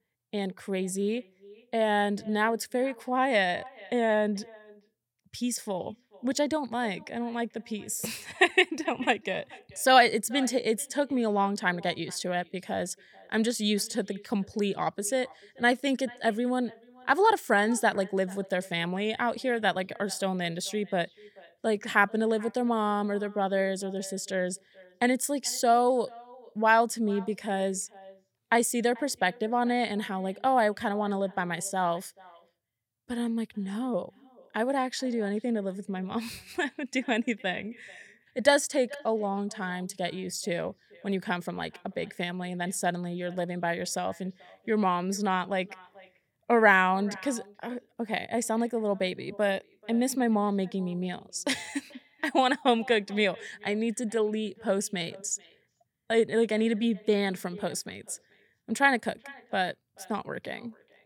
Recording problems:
echo of what is said; faint; throughout; 440 ms later, 25 dB below the speech

